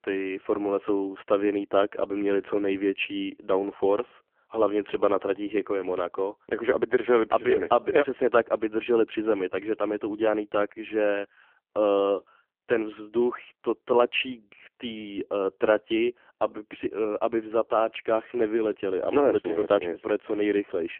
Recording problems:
phone-call audio; poor line; nothing above 3 kHz

